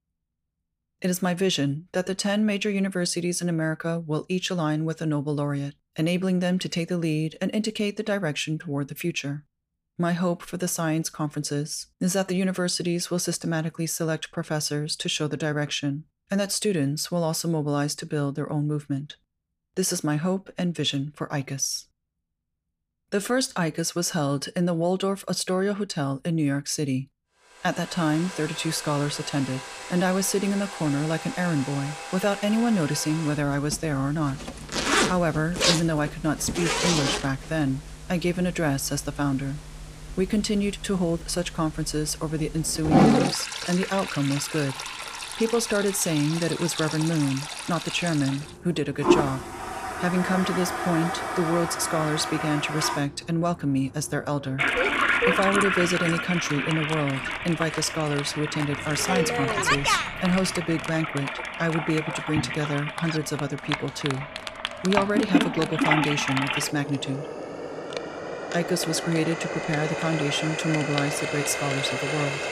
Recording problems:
household noises; loud; from 28 s on; 1 dB below the speech

